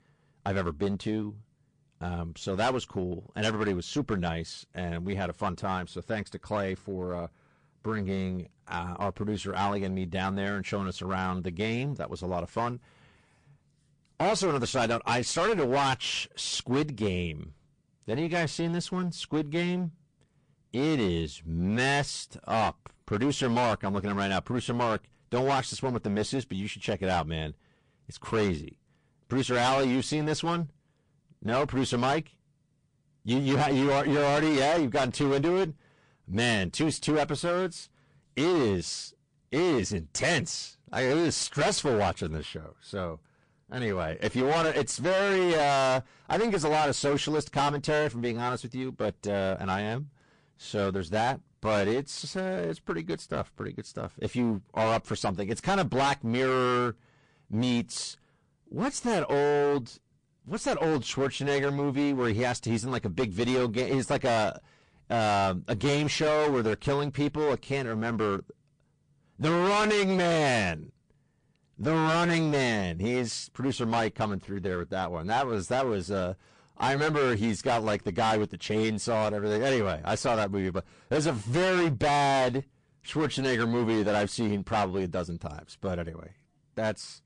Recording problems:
distortion; heavy; 16% of the sound clipped
garbled, watery; slightly; nothing above 9 kHz

